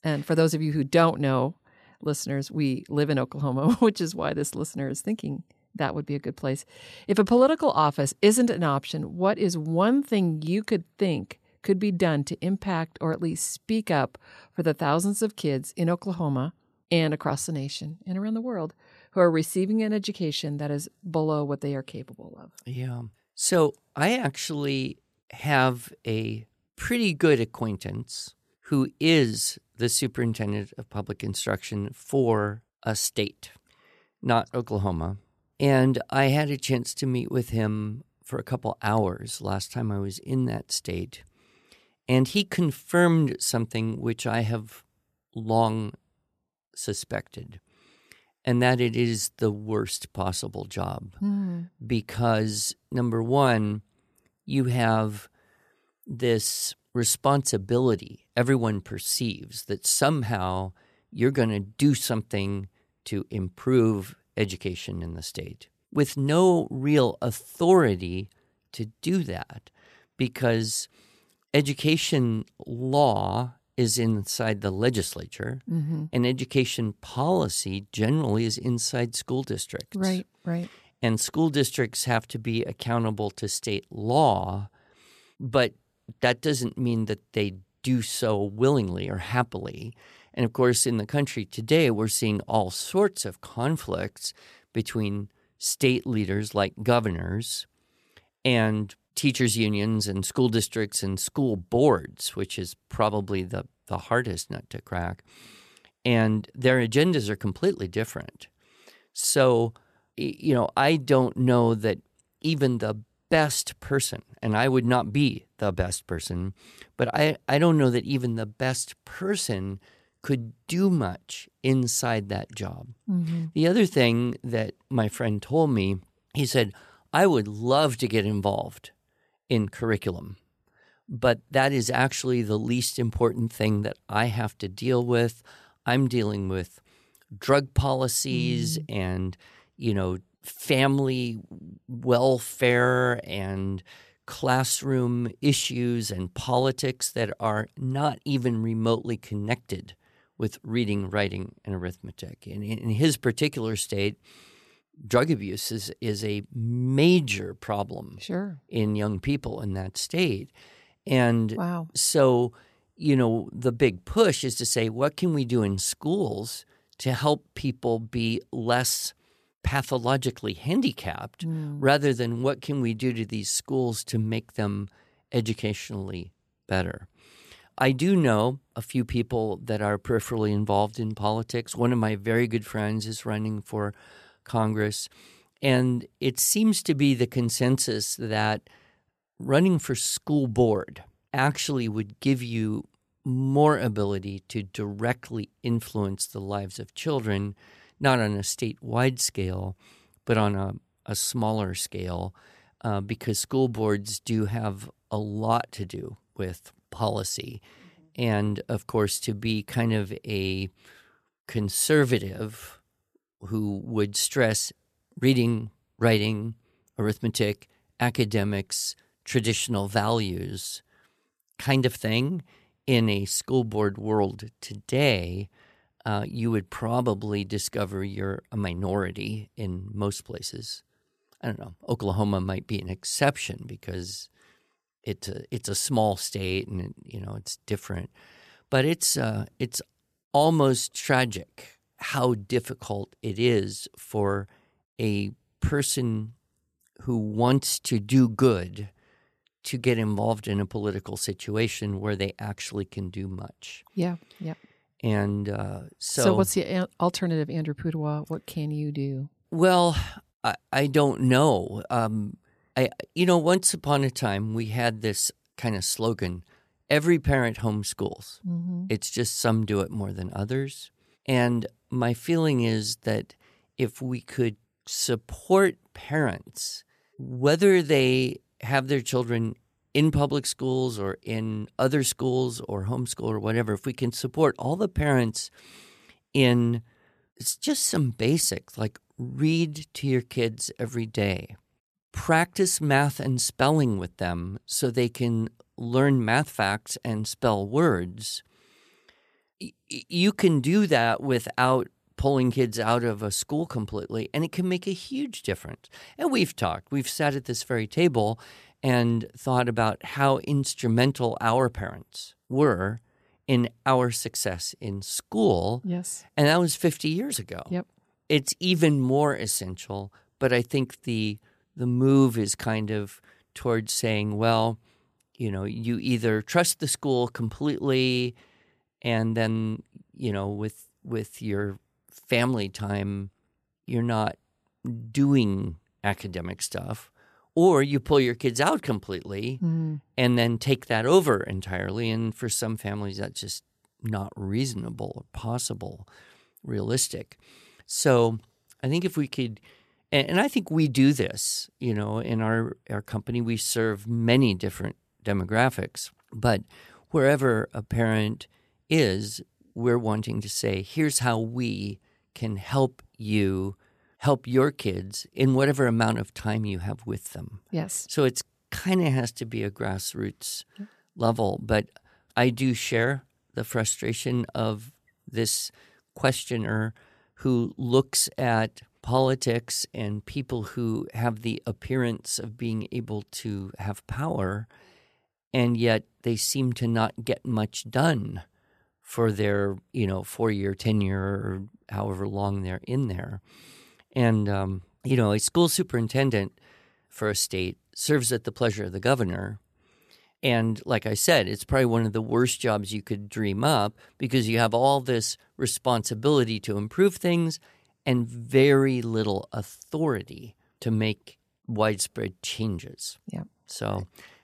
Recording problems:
none

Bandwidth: 14.5 kHz